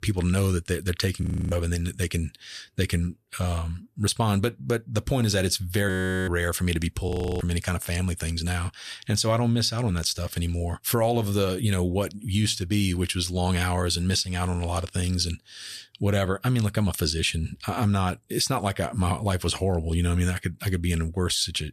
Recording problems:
audio freezing; at 1 s, at 6 s and at 7 s

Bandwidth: 14 kHz